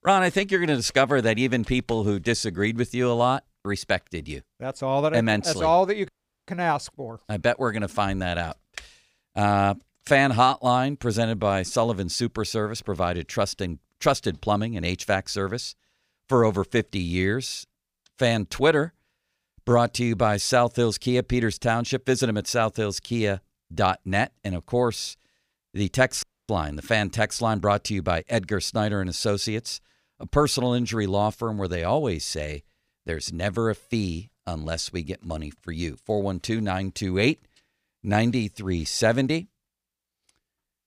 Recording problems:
audio cutting out; at 6 s and at 26 s

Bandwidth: 15 kHz